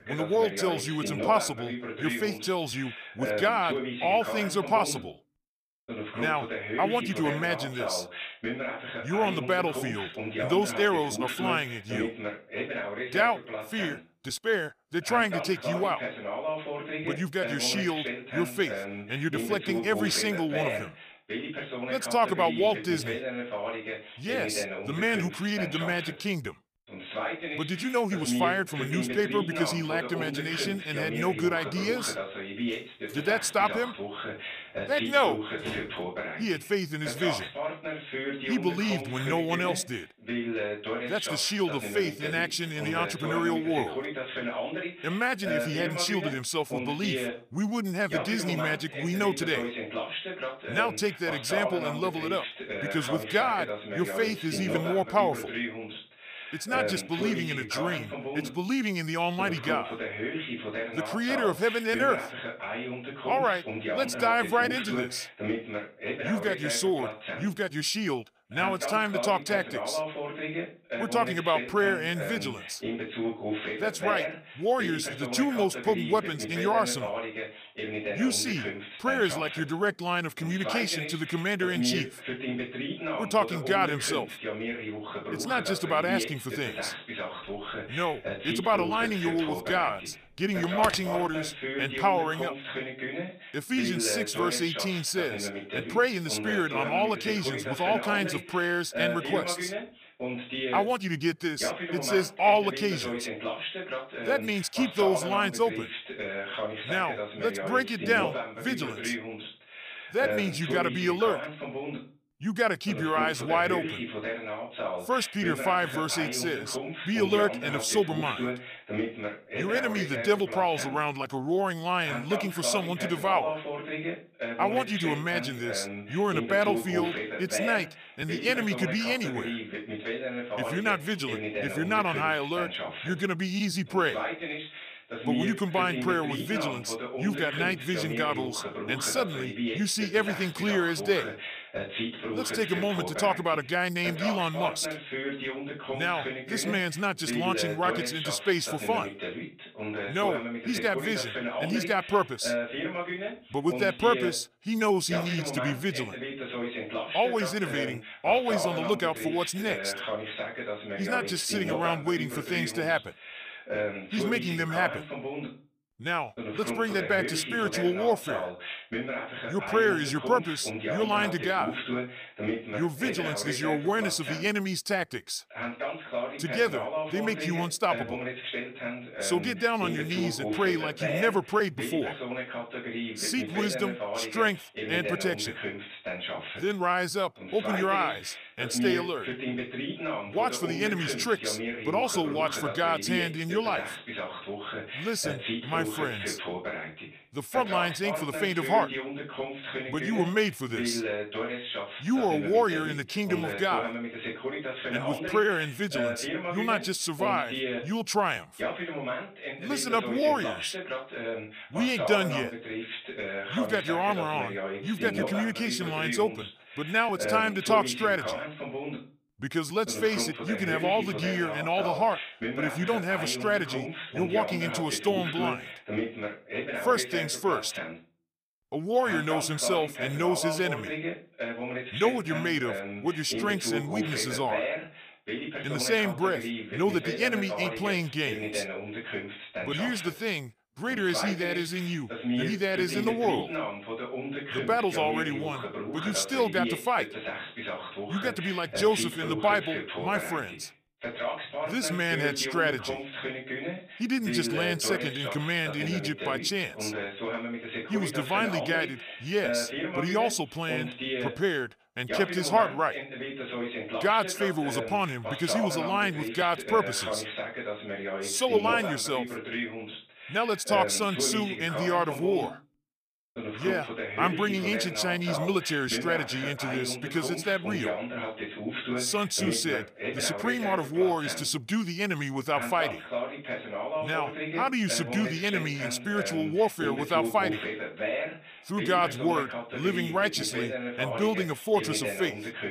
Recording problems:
voice in the background; loud; throughout; 5 dB below the speech
door banging; faint; from 33 to 36 s; peak 10 dB below the speech
phone ringing; noticeable; at 1:31; peak 5 dB below the speech

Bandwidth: 15 kHz